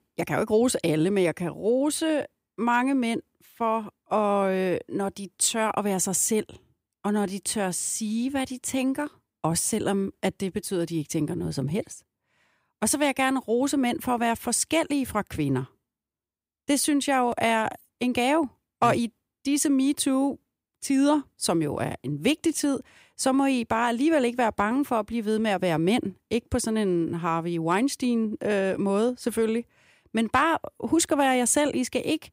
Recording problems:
none

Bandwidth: 15.5 kHz